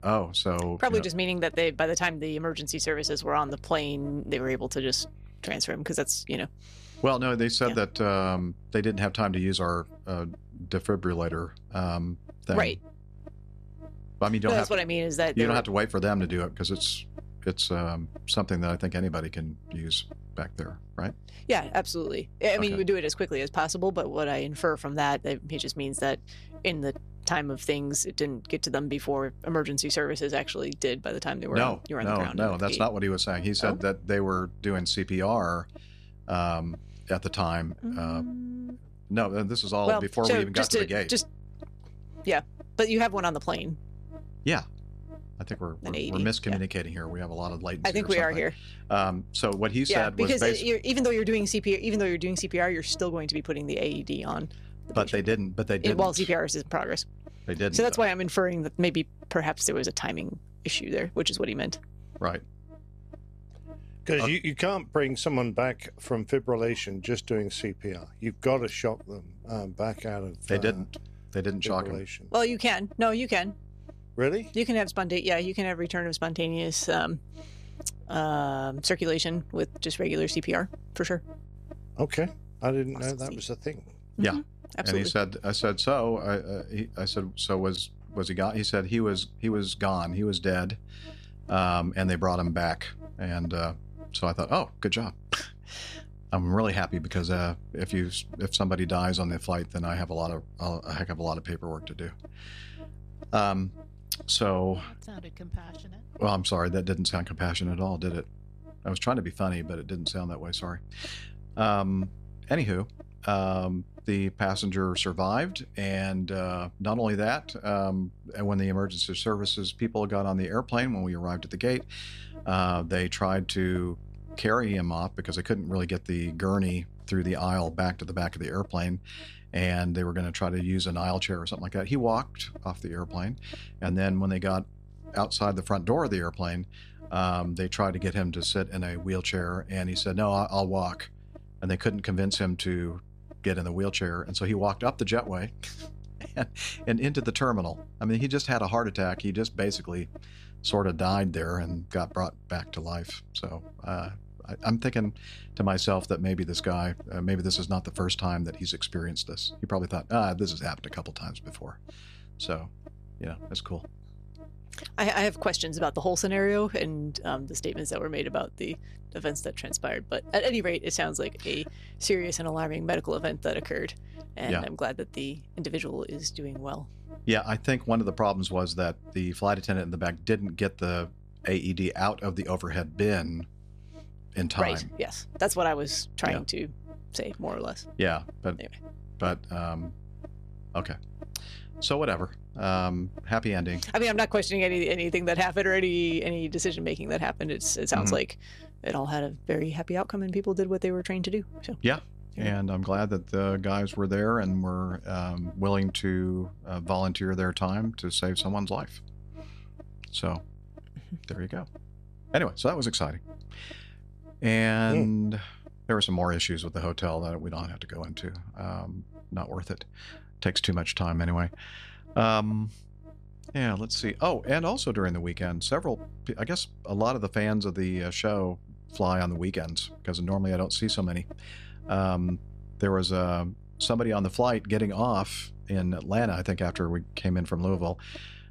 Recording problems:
electrical hum; faint; throughout; 50 Hz, 25 dB below the speech

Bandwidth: 14 kHz